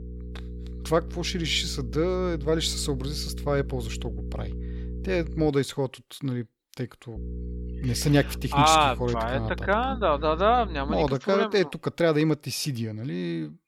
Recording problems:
electrical hum; faint; until 5.5 s and from 7 to 11 s; 60 Hz, 20 dB below the speech

